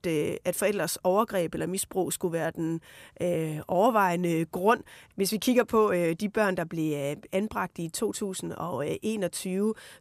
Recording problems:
none

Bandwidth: 14.5 kHz